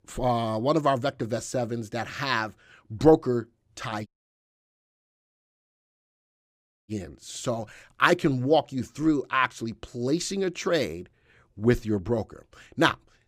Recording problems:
audio cutting out; at 4 s for 3 s

